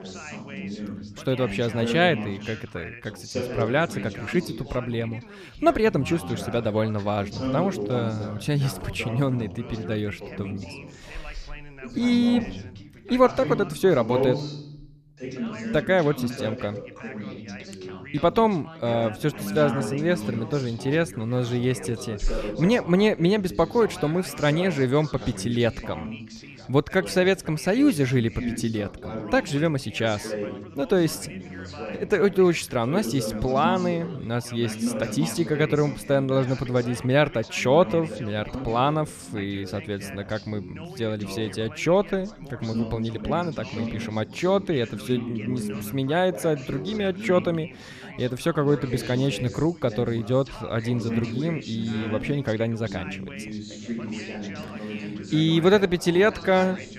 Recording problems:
background chatter; loud; throughout; 3 voices, 10 dB below the speech

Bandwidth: 14.5 kHz